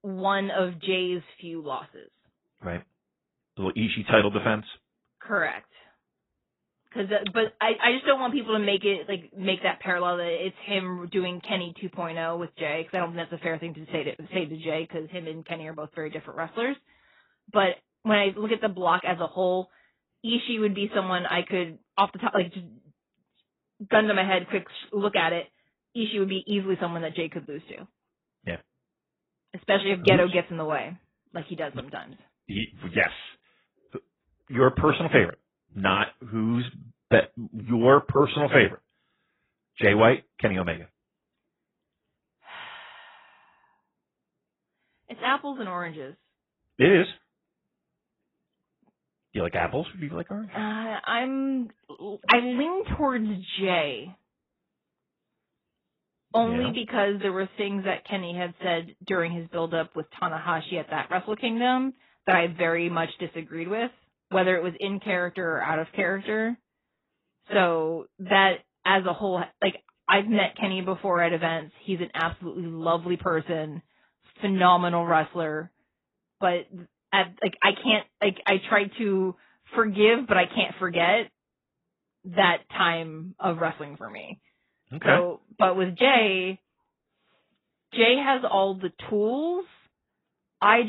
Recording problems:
garbled, watery; badly; nothing above 3.5 kHz
abrupt cut into speech; at the end

